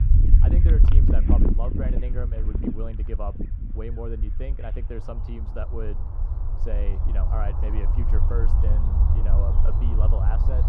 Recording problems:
muffled; very; fading above 2 kHz
animal sounds; very loud; throughout; 1 dB above the speech
low rumble; loud; throughout; 5 dB below the speech

